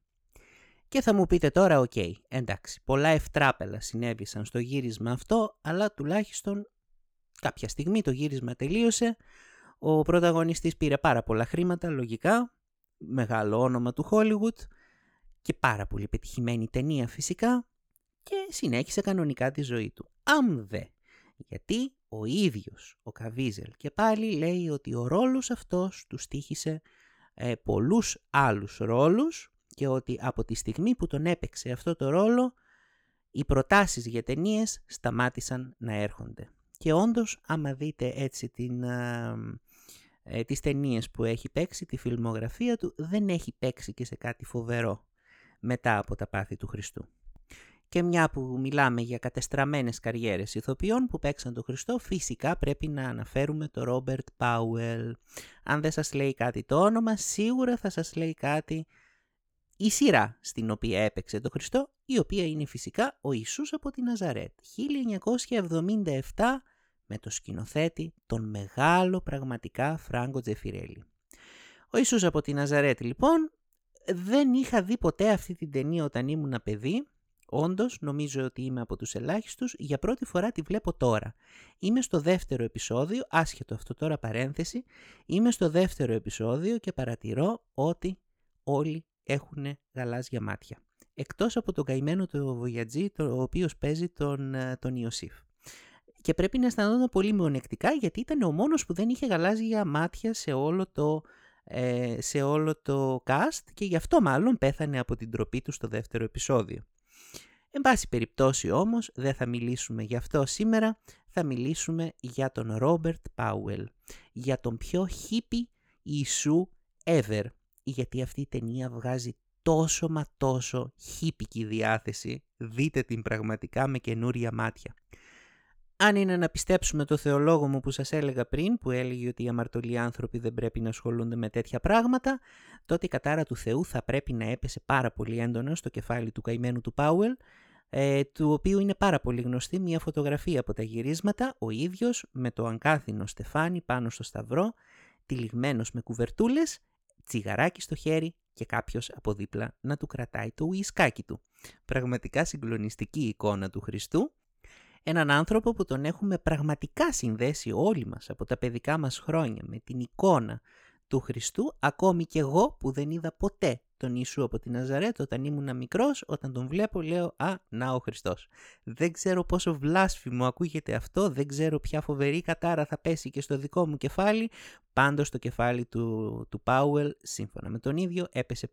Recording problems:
none

